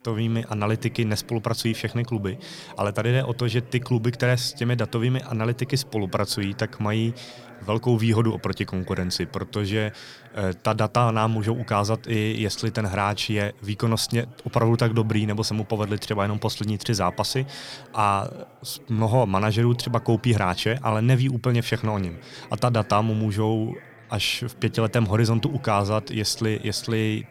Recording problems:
background chatter; faint; throughout; 4 voices, 20 dB below the speech

